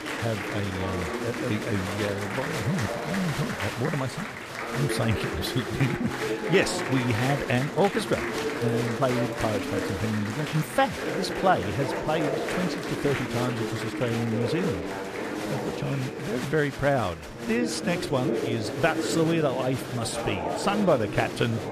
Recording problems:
murmuring crowd; loud; throughout; 3 dB below the speech

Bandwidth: 14.5 kHz